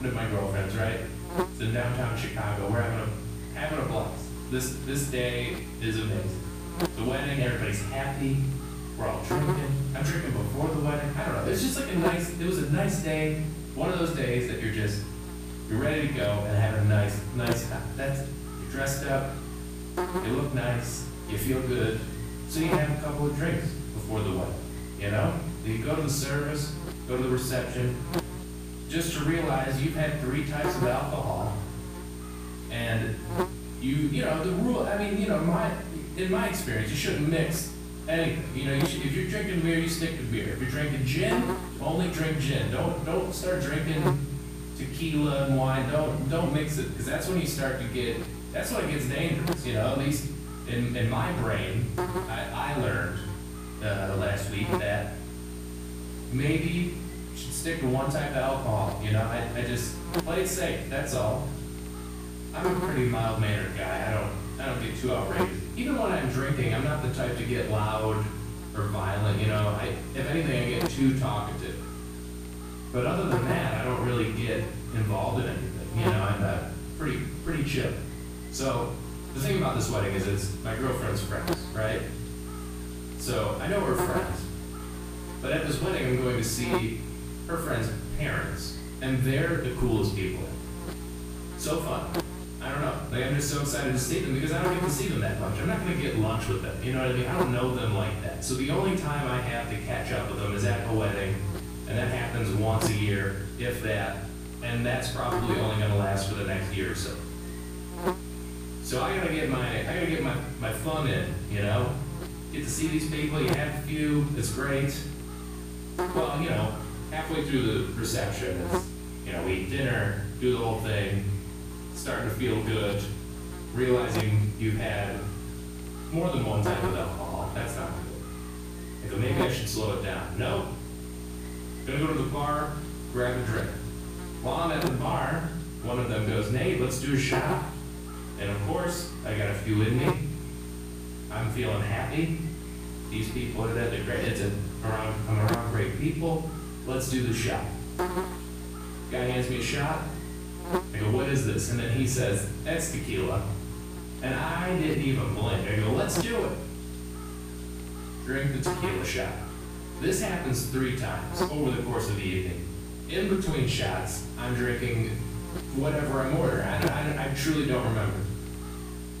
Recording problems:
off-mic speech; far
room echo; noticeable; dies away in 0.7 s
electrical hum; loud; throughout; 60 Hz, 9 dB below the speech
abrupt cut into speech; at the start

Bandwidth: 15 kHz